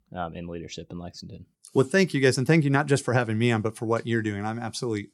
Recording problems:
none

